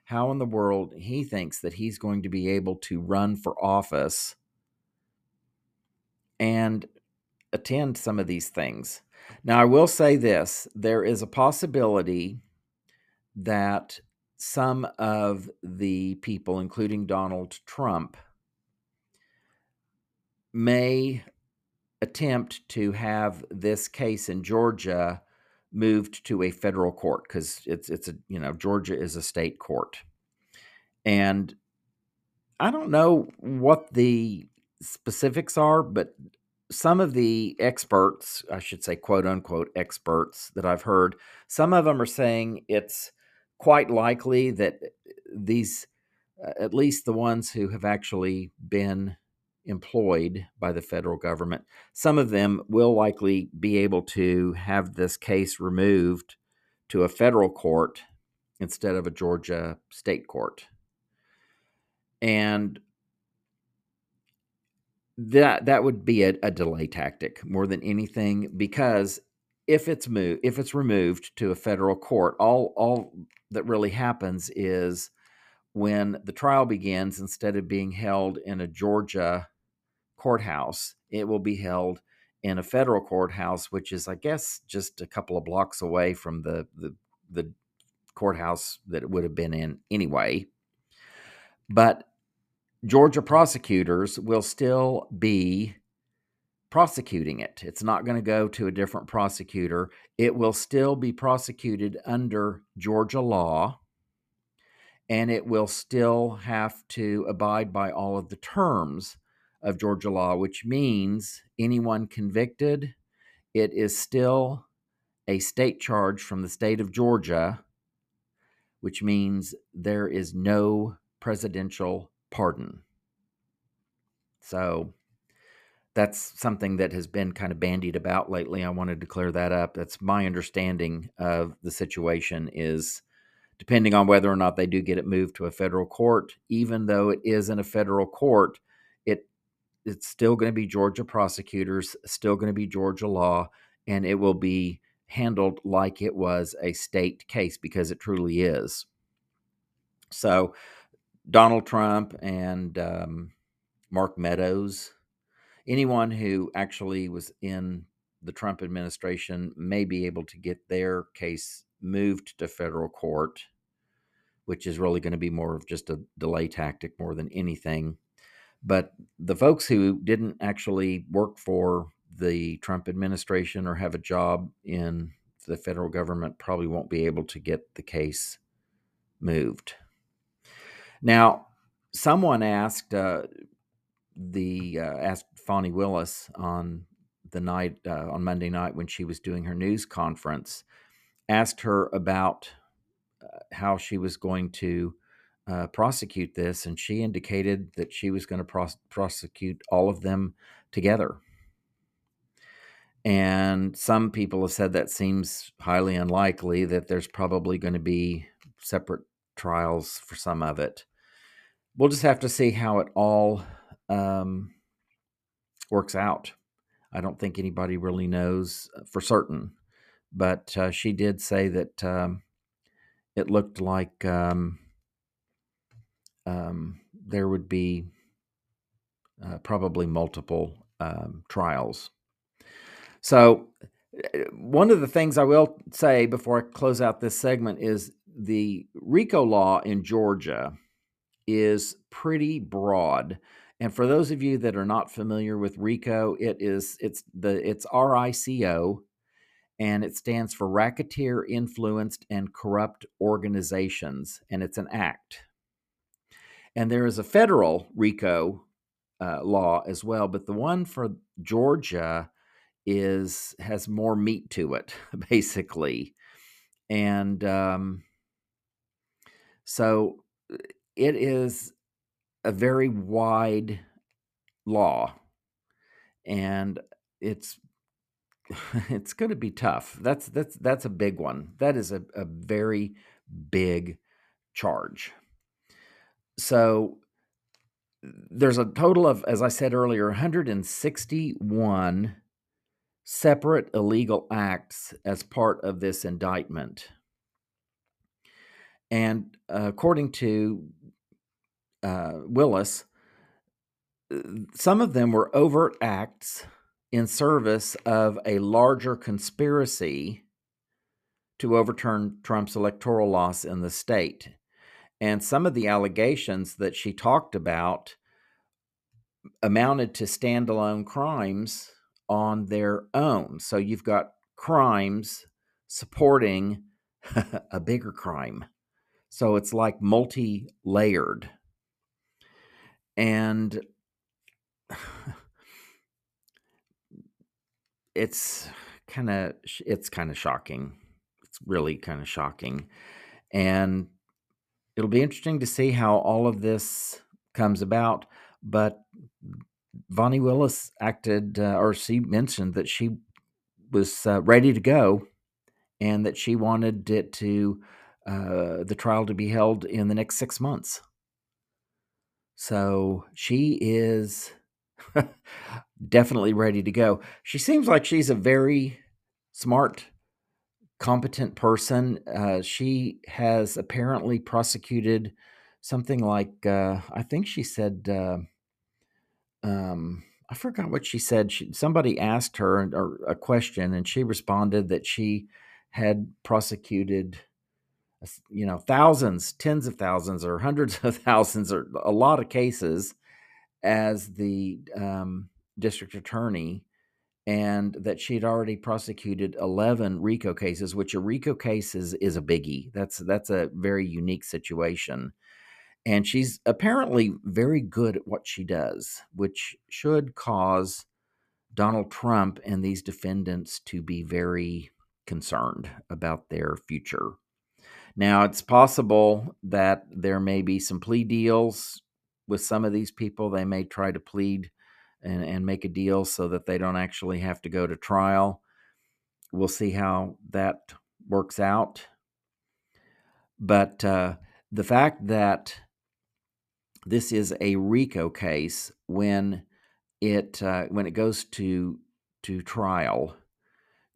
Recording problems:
none

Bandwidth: 14.5 kHz